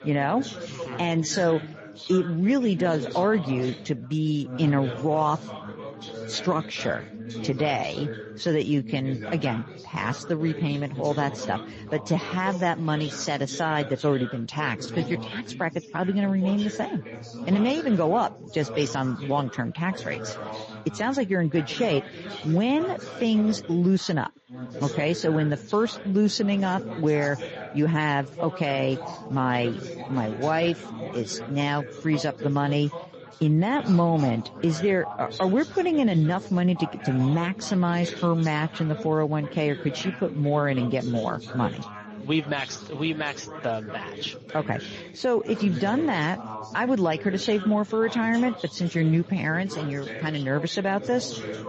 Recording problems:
garbled, watery; slightly; nothing above 7 kHz
background chatter; noticeable; throughout; 4 voices, 10 dB below the speech

